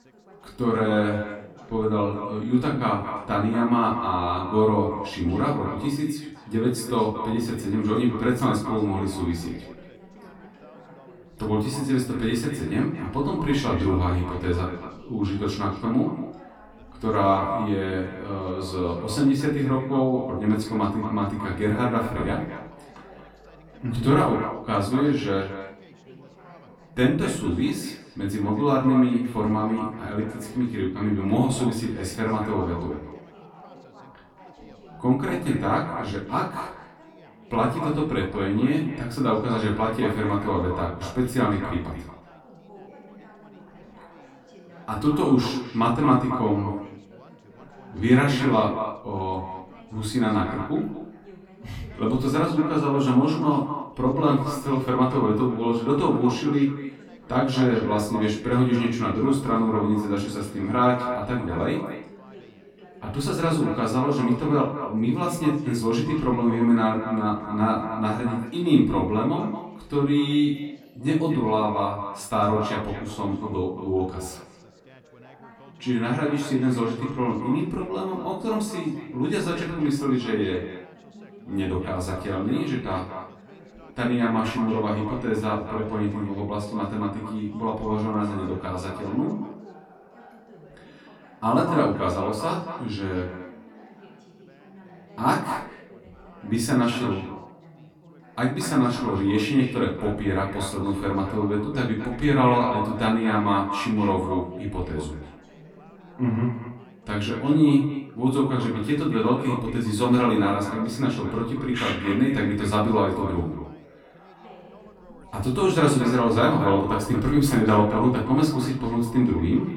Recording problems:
echo of what is said; strong; throughout; 230 ms later, 10 dB below the speech
off-mic speech; far
room echo; slight; dies away in 0.4 s
background chatter; faint; throughout; 3 voices, 25 dB below the speech

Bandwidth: 17 kHz